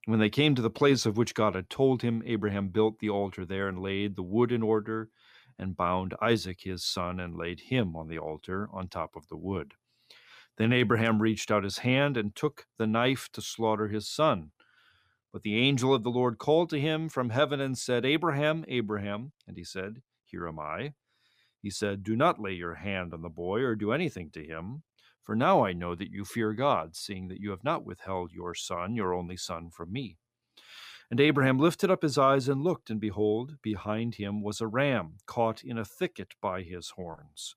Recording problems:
none

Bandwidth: 15 kHz